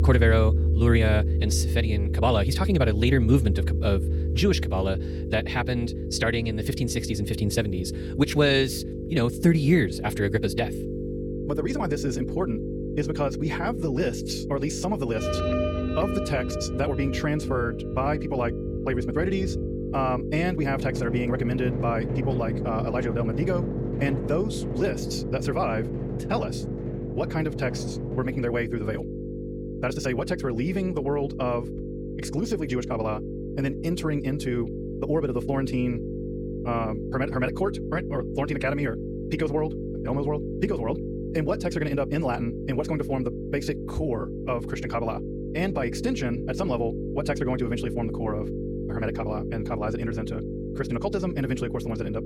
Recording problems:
wrong speed, natural pitch; too fast; 1.5 times normal speed
electrical hum; loud; throughout; 50 Hz, 7 dB below the speech
background music; loud; until 28 s; 3 dB below the speech

